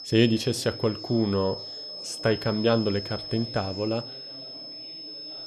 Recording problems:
high-pitched whine; loud; throughout; 5 kHz, 10 dB below the speech
chatter from many people; faint; throughout; 20 dB below the speech

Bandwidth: 14.5 kHz